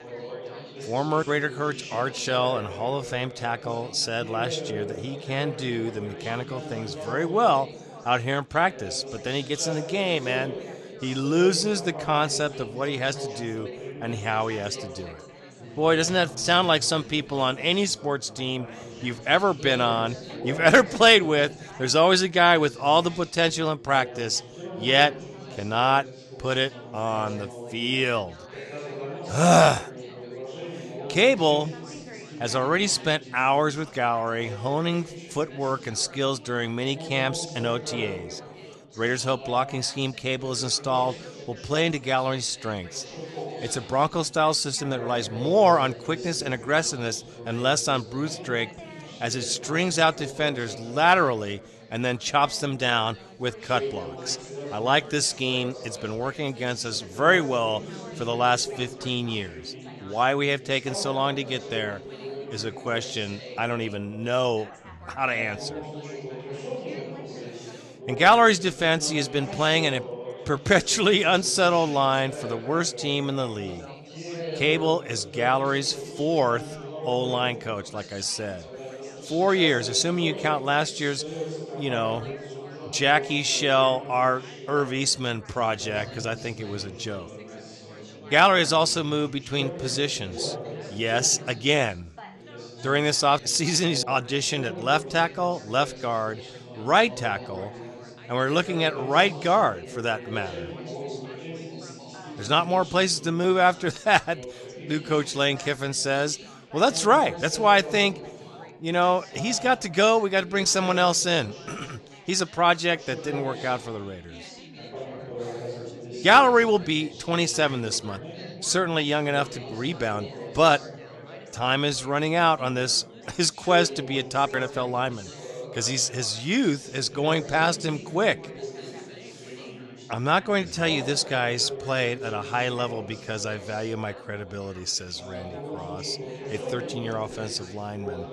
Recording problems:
chatter from many people; noticeable; throughout; 15 dB below the speech

